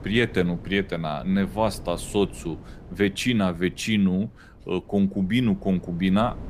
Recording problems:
wind noise on the microphone; occasional gusts; 20 dB below the speech

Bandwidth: 15 kHz